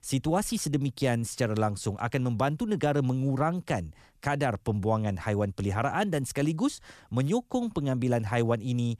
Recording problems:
none

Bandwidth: 14 kHz